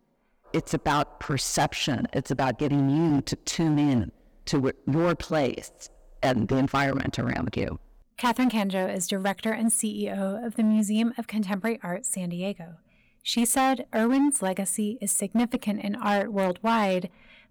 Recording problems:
distortion; slight; 8% of the sound clipped

